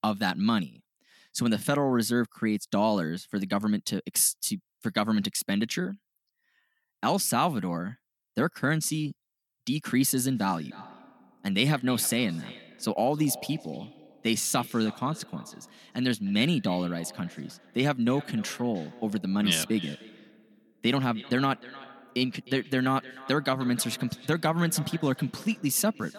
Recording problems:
echo of what is said; faint; from 10 s on; 310 ms later, 20 dB below the speech

